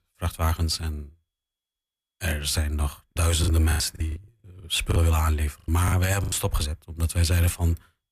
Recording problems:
choppy; very; from 3 to 6.5 s; 15% of the speech affected

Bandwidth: 14.5 kHz